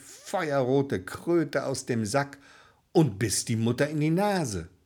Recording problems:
none

